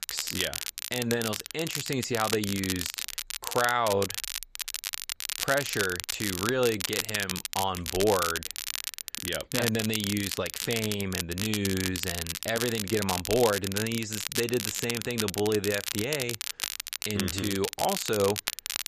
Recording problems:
crackle, like an old record; loud; 3 dB below the speech

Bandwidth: 14.5 kHz